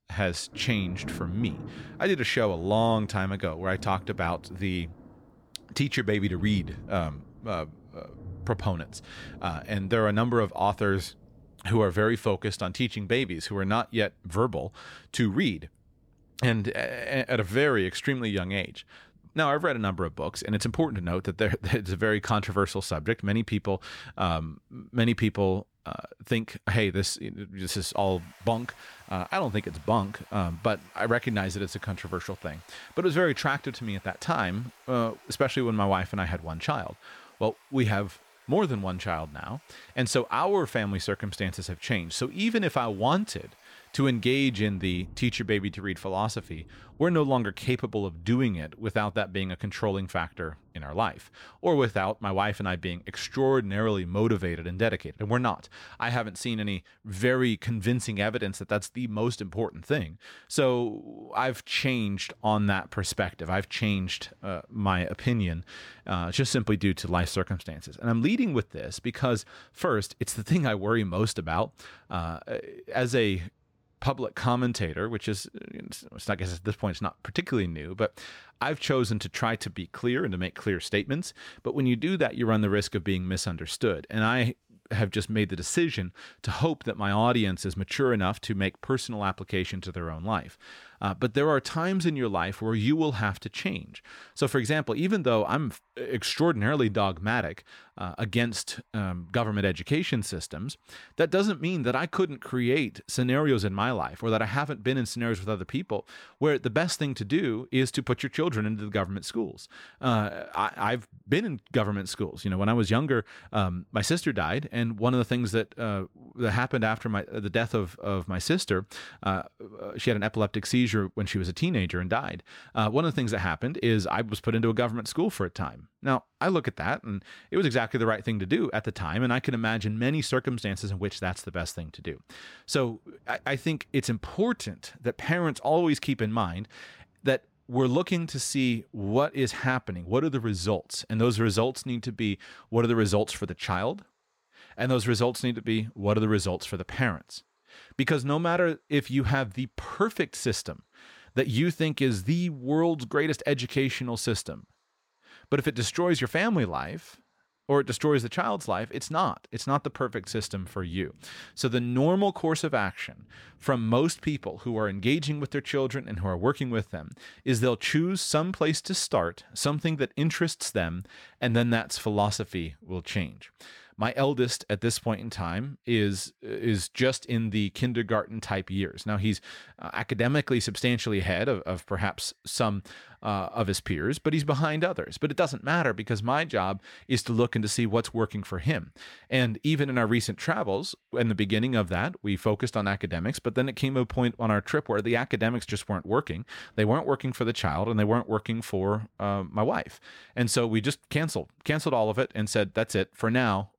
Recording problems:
rain or running water; faint; throughout; 25 dB below the speech

